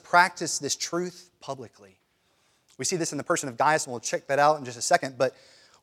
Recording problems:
uneven, jittery; strongly; from 0.5 to 5 s

